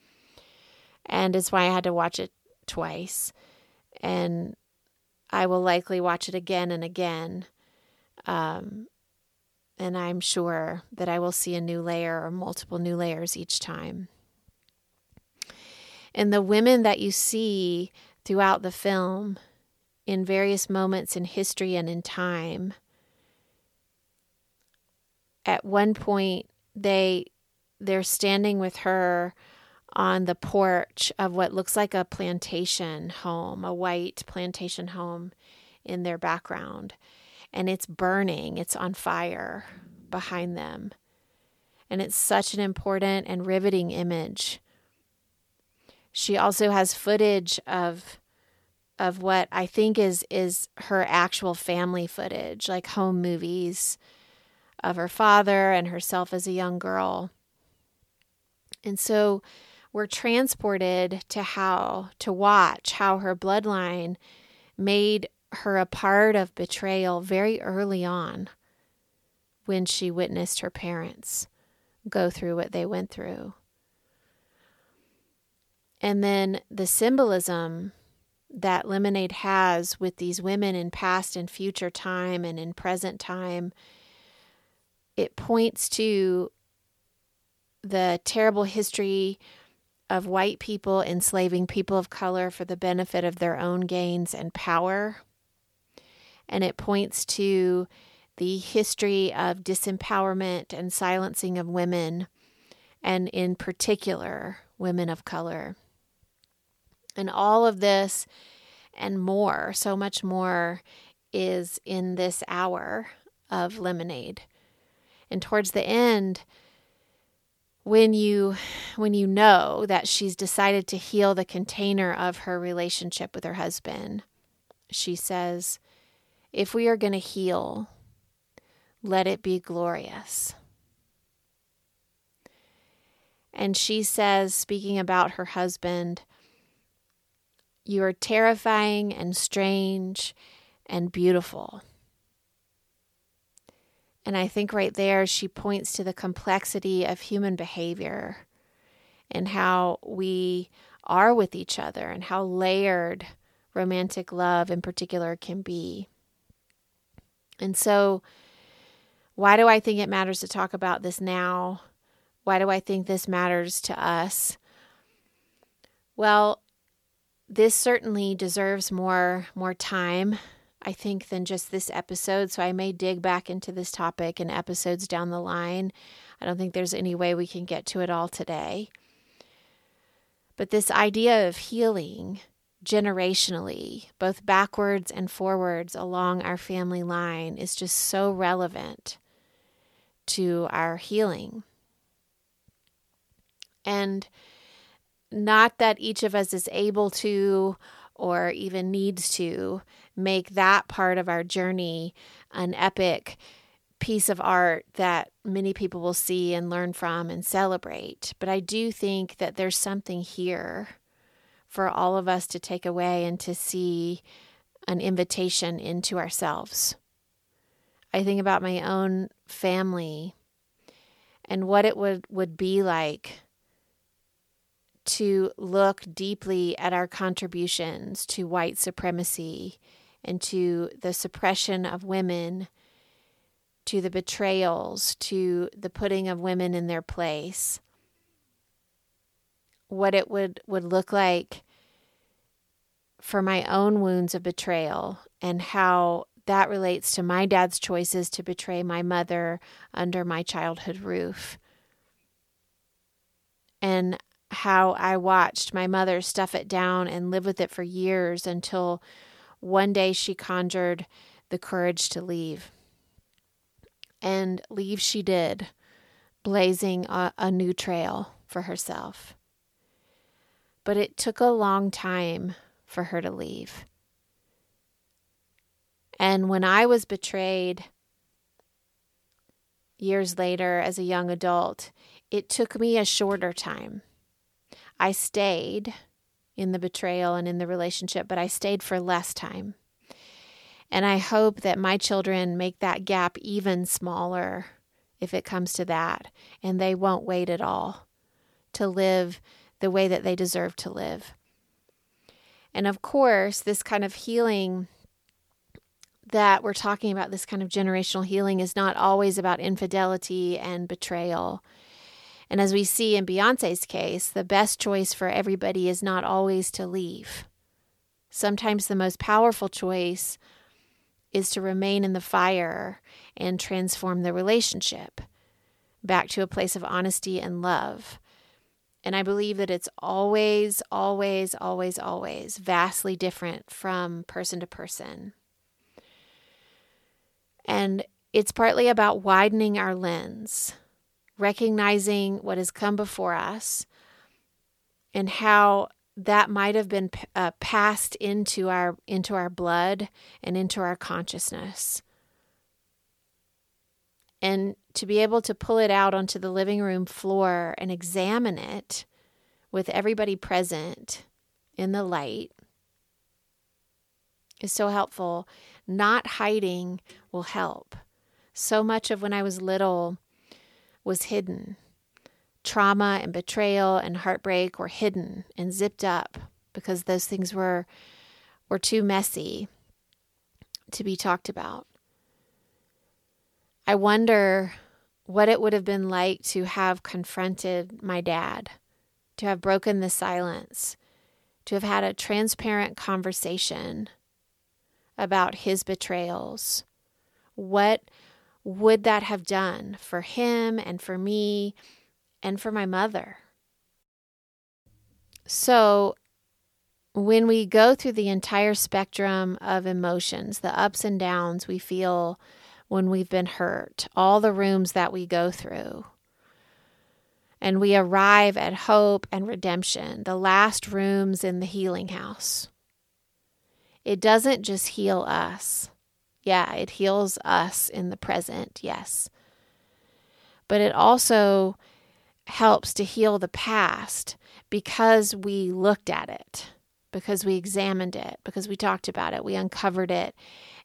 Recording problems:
none

